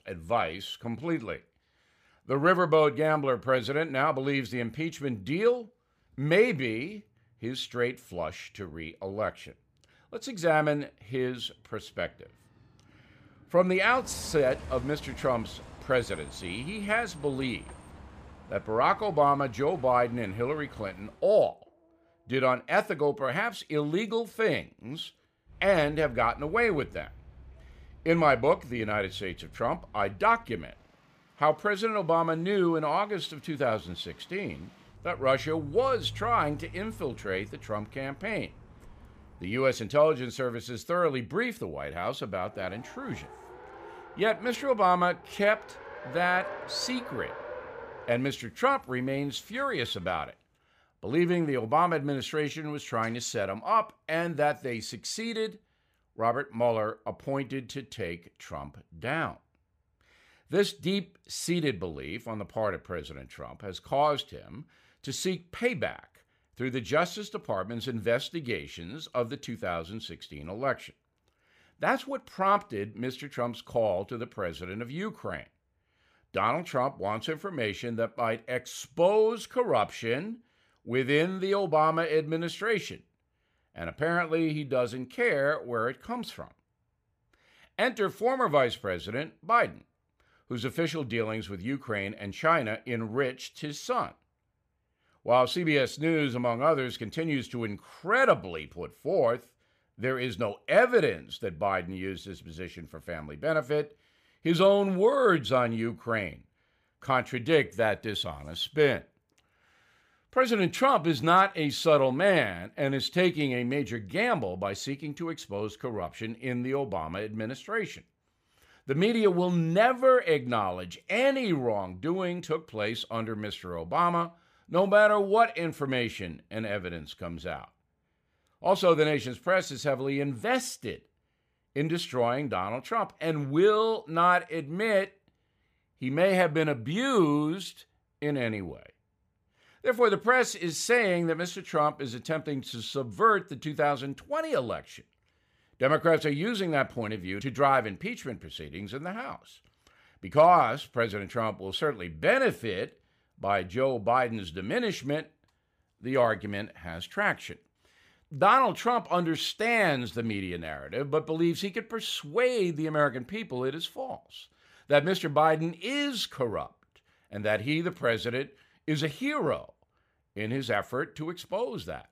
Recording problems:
traffic noise; noticeable; until 50 s; 20 dB below the speech

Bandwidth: 15 kHz